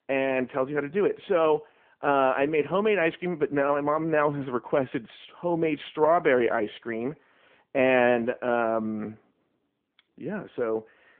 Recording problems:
phone-call audio

